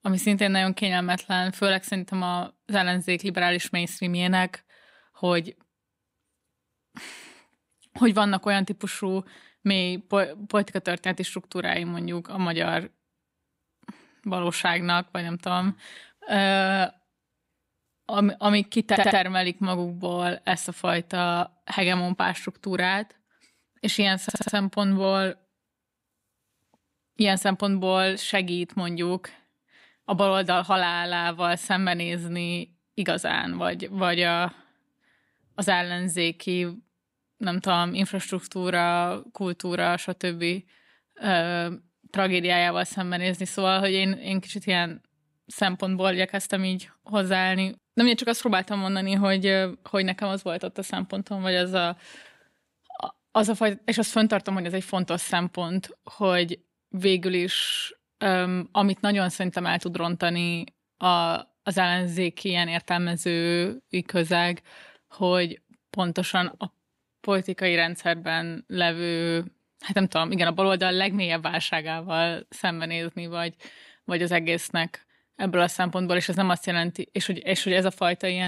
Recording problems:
audio stuttering; at 19 s and at 24 s
abrupt cut into speech; at the end

